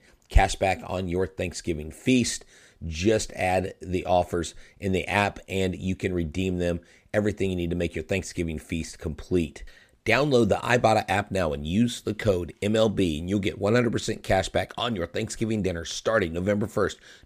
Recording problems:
none

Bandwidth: 15 kHz